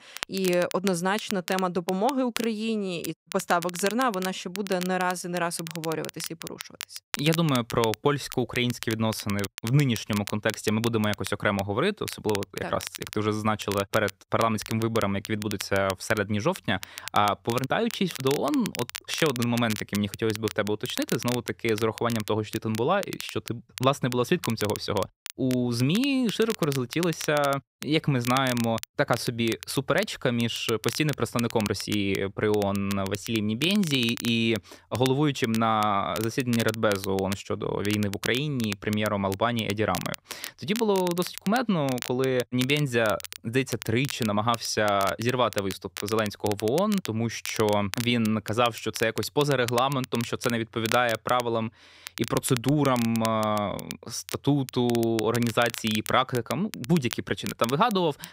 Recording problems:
crackle, like an old record; noticeable; 10 dB below the speech

